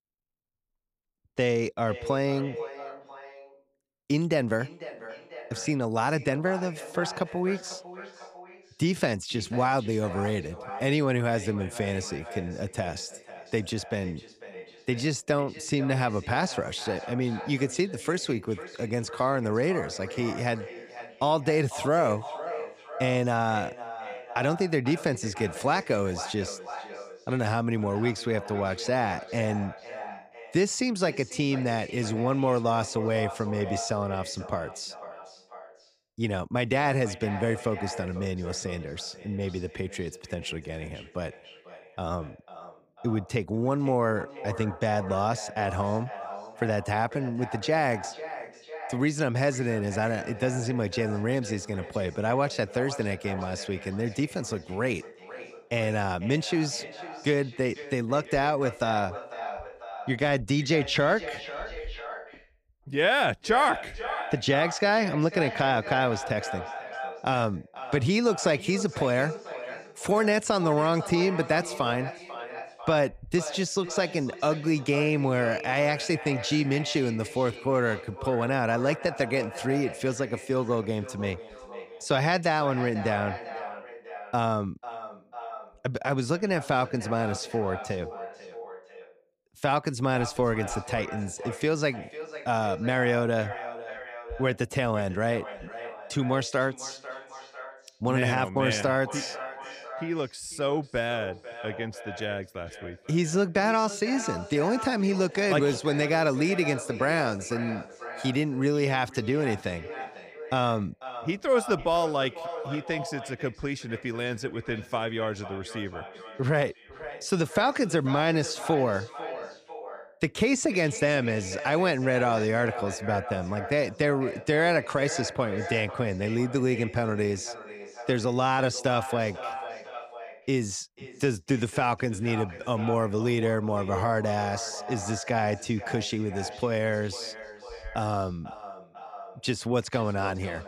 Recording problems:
echo of what is said; noticeable; throughout; 490 ms later, 10 dB below the speech

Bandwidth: 15 kHz